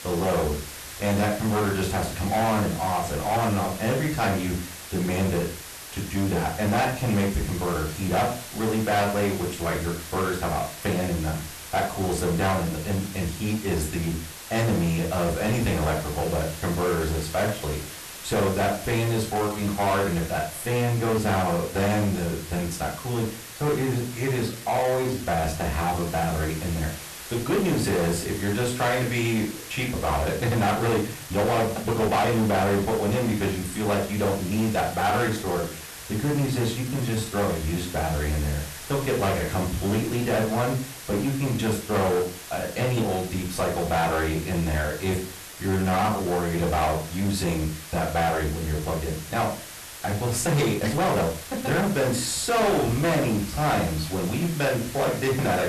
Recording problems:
distortion; heavy; 8 dB below the speech
off-mic speech; far
room echo; slight; dies away in 0.3 s
hiss; noticeable; throughout; 10 dB below the speech
uneven, jittery; strongly; from 19 to 52 s

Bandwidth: 13.5 kHz